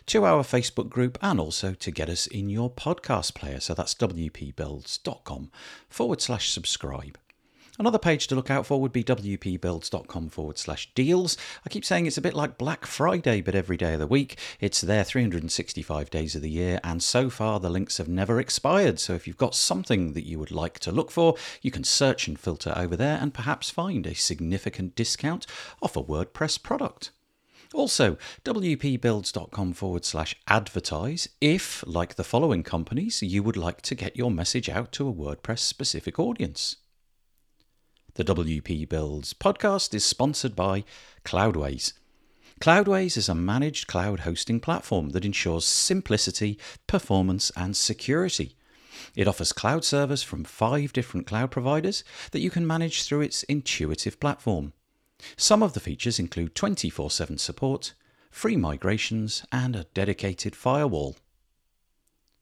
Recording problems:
none

